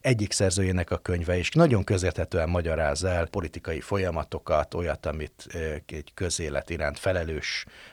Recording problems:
none

